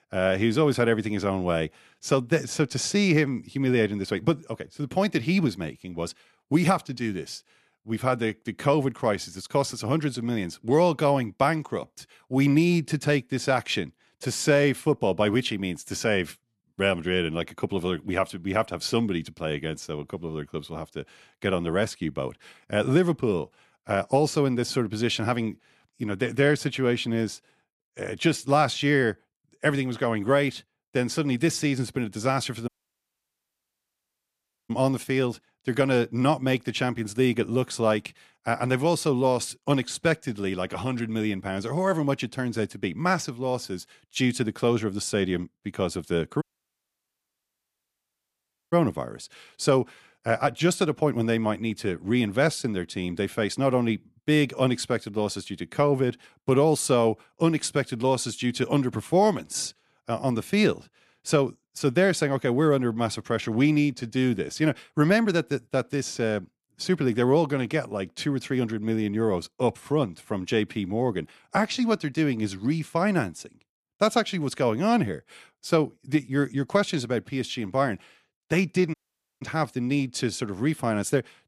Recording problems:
audio cutting out; at 33 s for 2 s, at 46 s for 2.5 s and at 1:19

